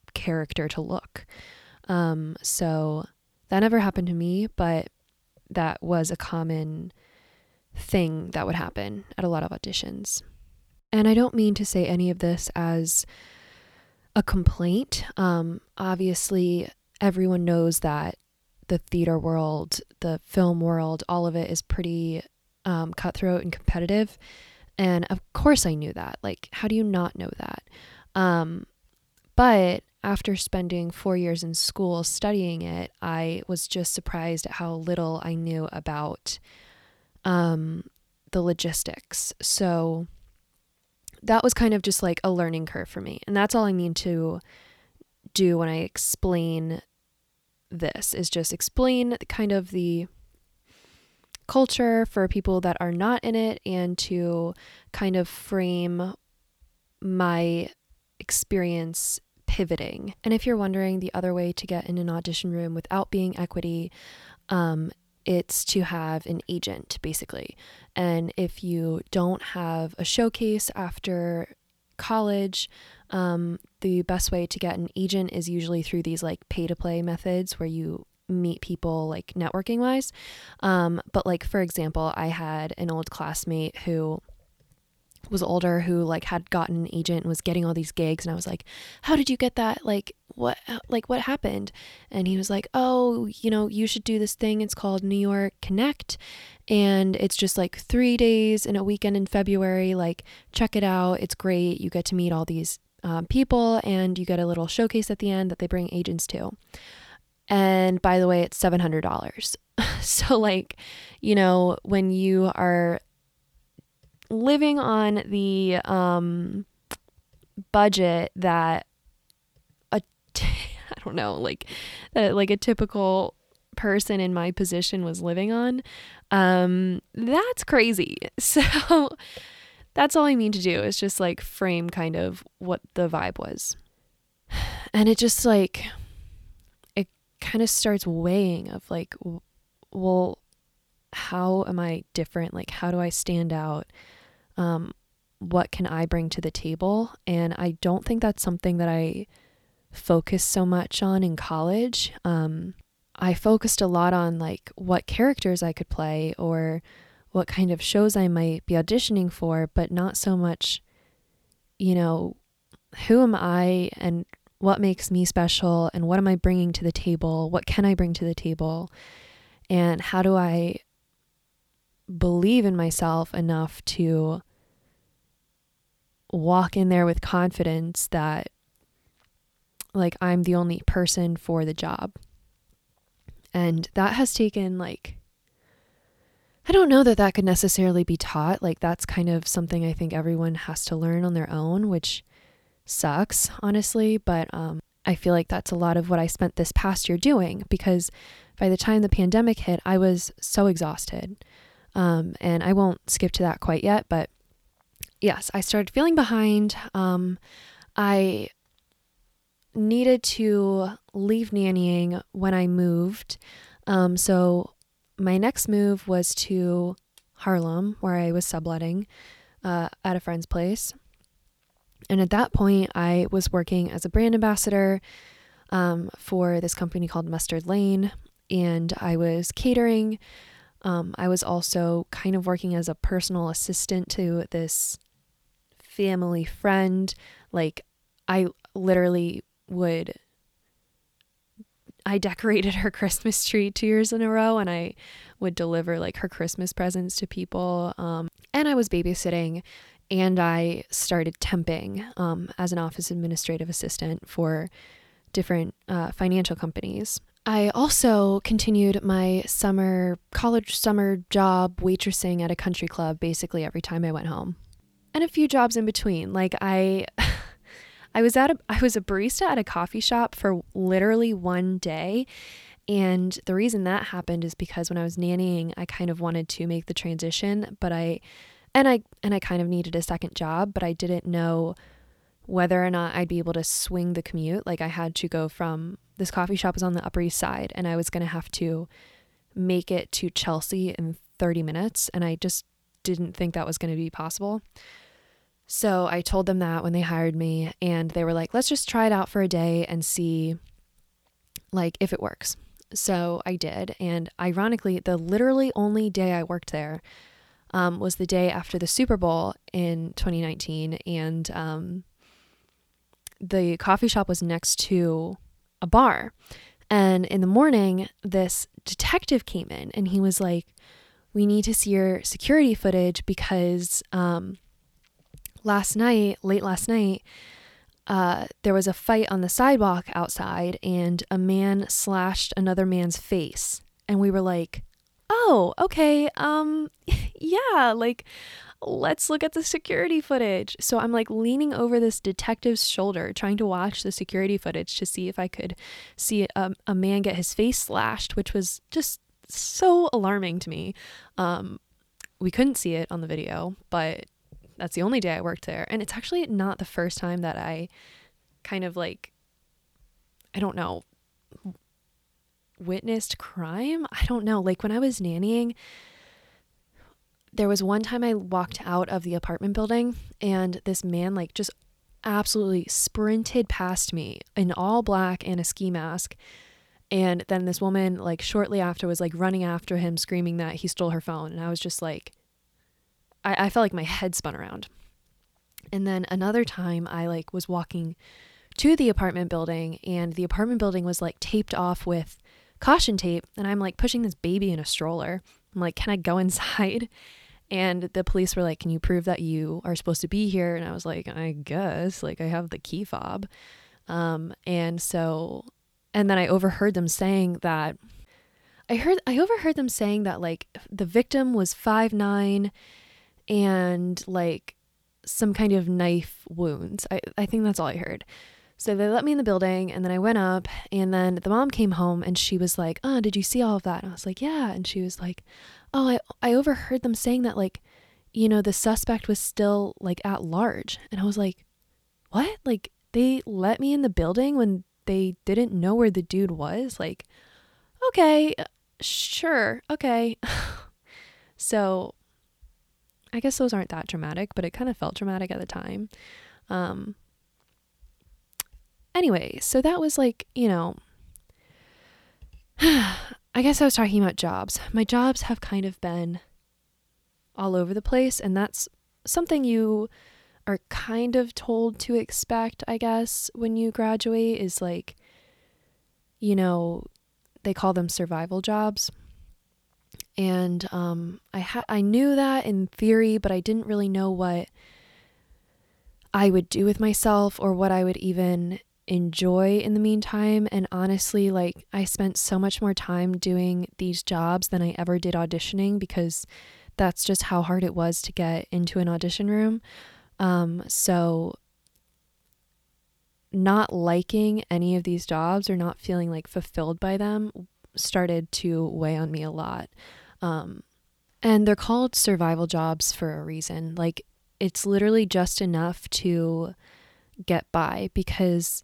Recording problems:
none

